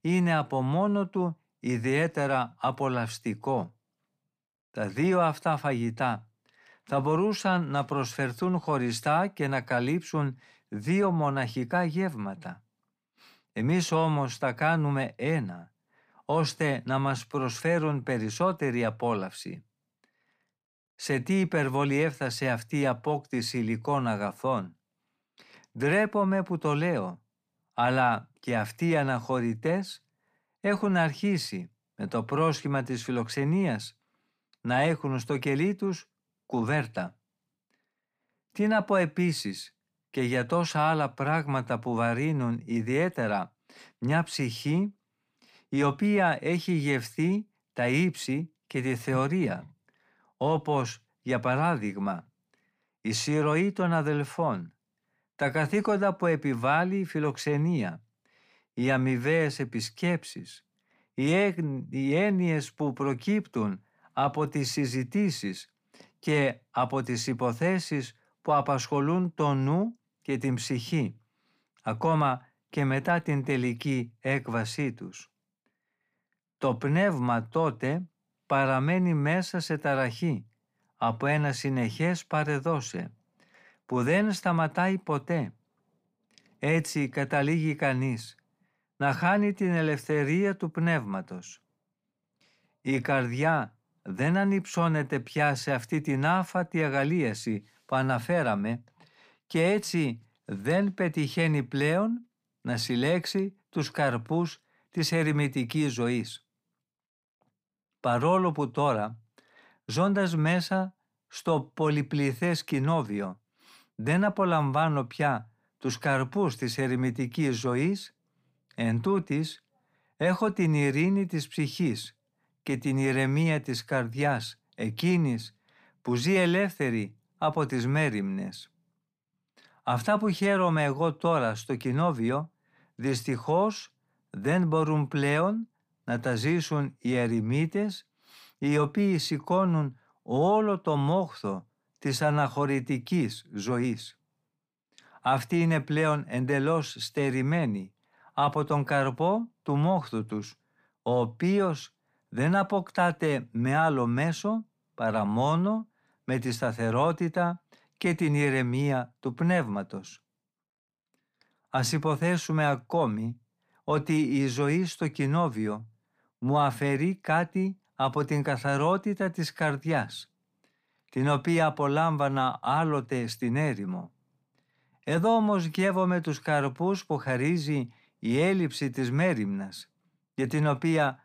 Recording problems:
none

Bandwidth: 15 kHz